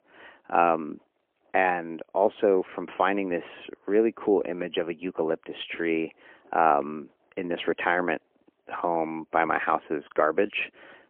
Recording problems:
phone-call audio; poor line; nothing above 3 kHz

